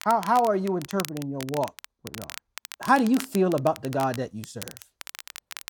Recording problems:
crackle, like an old record; noticeable; 15 dB below the speech

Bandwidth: 18 kHz